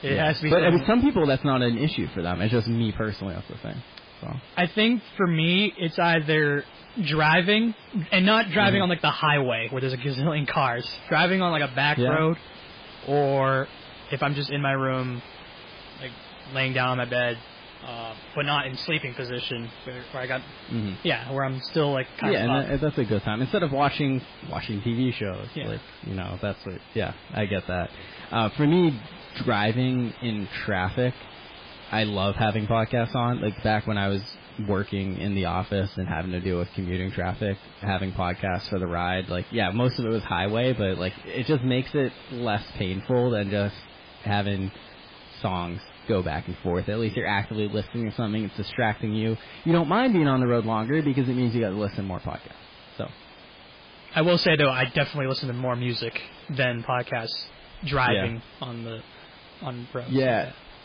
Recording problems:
garbled, watery; badly; nothing above 5 kHz
distortion; slight; 10 dB below the speech
hiss; noticeable; throughout; 20 dB below the speech

